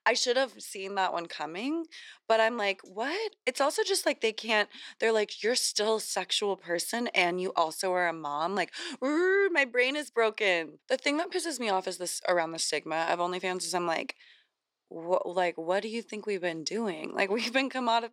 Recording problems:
thin; somewhat; fading below 400 Hz

